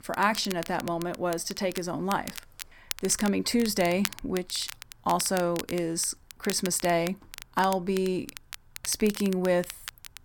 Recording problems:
crackle, like an old record; noticeable; 10 dB below the speech

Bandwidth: 17.5 kHz